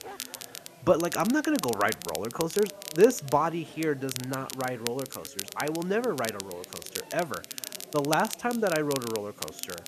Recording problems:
crackle, like an old record; loud; 10 dB below the speech
animal sounds; faint; throughout; 25 dB below the speech
chatter from many people; faint; throughout; 25 dB below the speech
hiss; faint; throughout; 30 dB below the speech

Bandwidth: 14 kHz